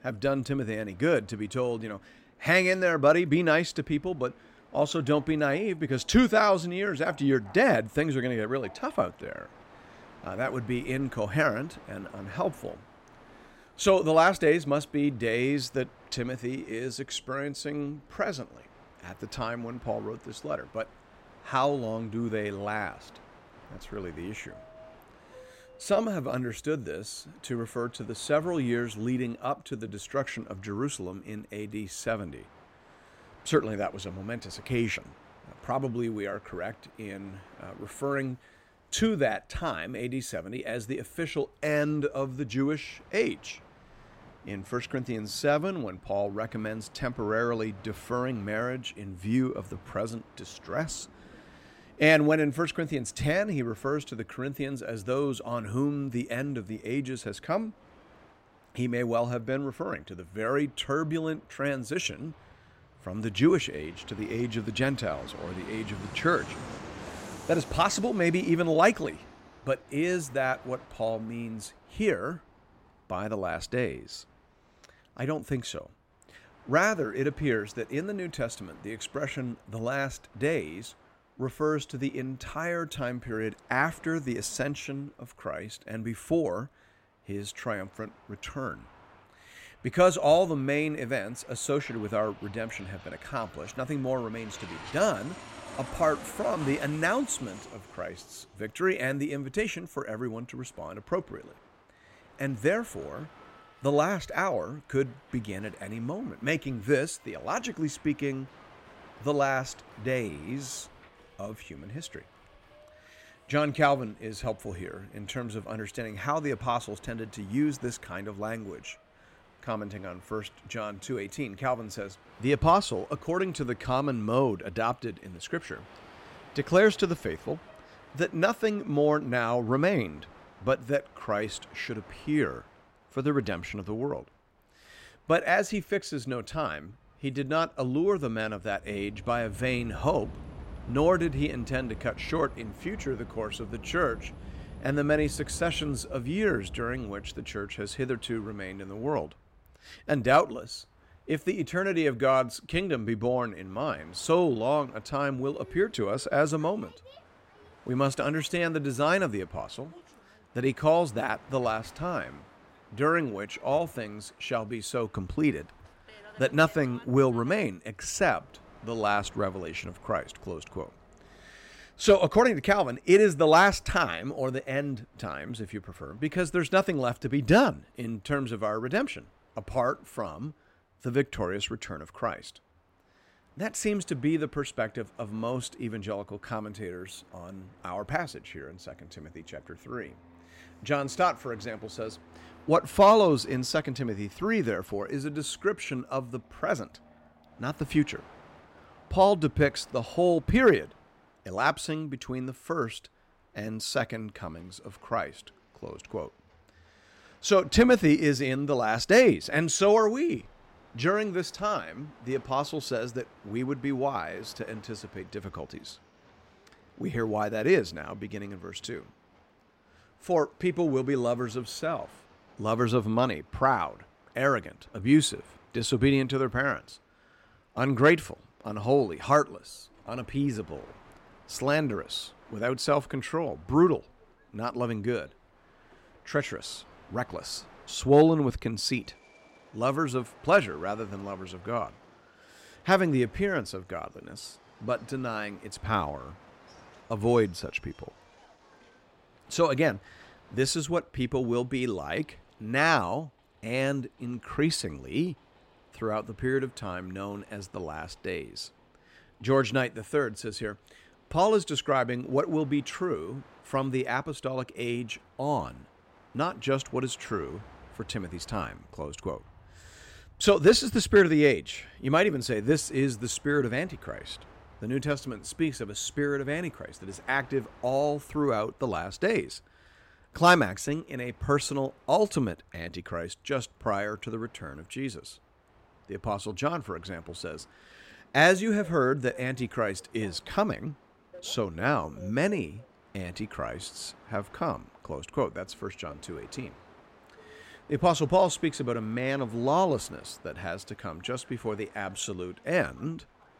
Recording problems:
train or aircraft noise; faint; throughout; 25 dB below the speech

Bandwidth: 16 kHz